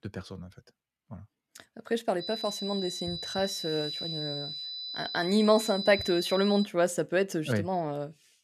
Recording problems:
high-pitched whine; loud; from 2 to 6.5 s; 4 kHz, 6 dB below the speech

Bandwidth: 14.5 kHz